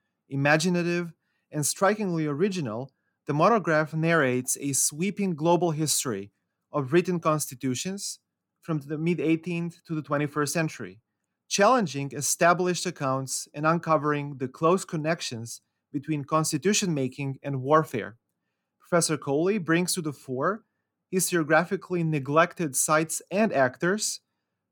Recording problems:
none

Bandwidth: 18 kHz